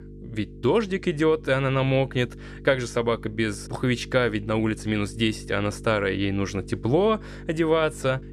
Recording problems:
electrical hum; faint; throughout; 50 Hz, 20 dB below the speech

